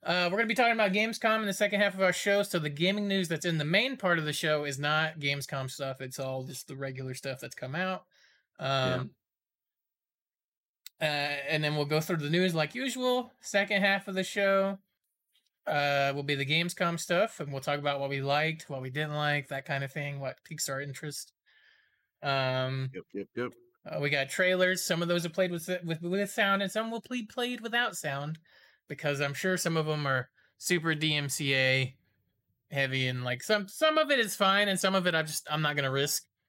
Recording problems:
none

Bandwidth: 16 kHz